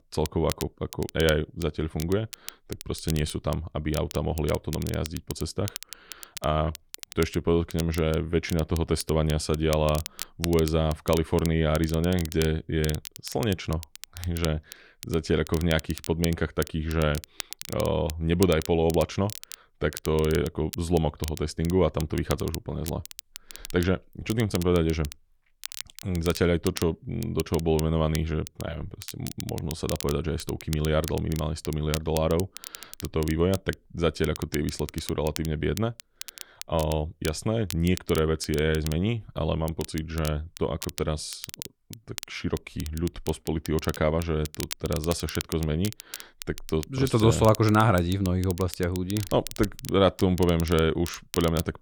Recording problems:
crackle, like an old record; noticeable; 15 dB below the speech

